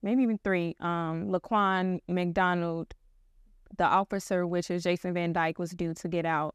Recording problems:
none

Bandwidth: 14.5 kHz